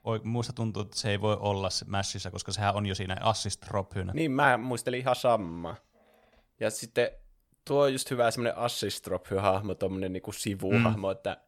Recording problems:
uneven, jittery; strongly; from 0.5 to 11 s

